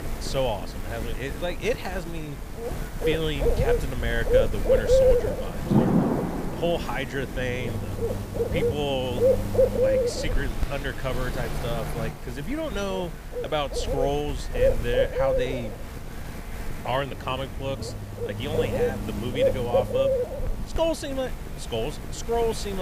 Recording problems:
animal sounds; very loud; throughout; 3 dB above the speech
rain or running water; loud; throughout; 3 dB below the speech
traffic noise; noticeable; throughout; 15 dB below the speech
hiss; faint; from 7.5 to 17 s; 25 dB below the speech
abrupt cut into speech; at the end

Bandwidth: 15 kHz